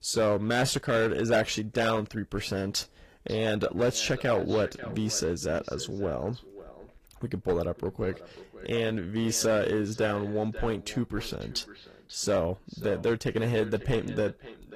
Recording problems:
echo of what is said; noticeable; from 3 s on; 540 ms later, 15 dB below the speech
distortion; slight; 4% of the sound clipped
garbled, watery; slightly; nothing above 15 kHz

